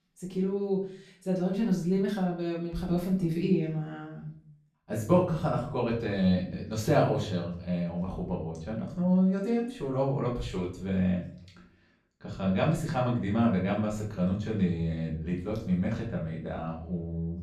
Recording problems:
off-mic speech; far
room echo; slight; dies away in 0.5 s

